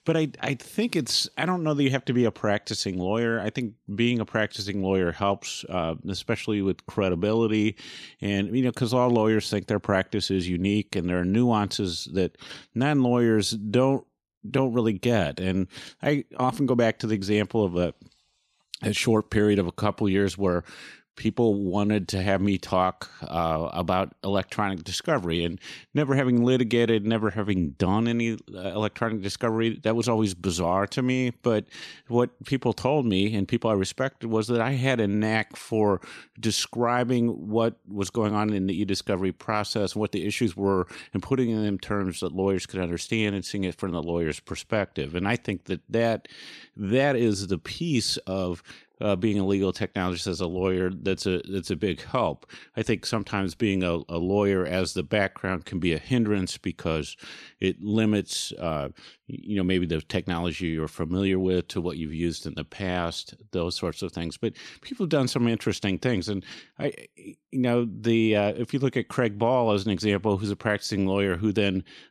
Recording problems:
none

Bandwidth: 13.5 kHz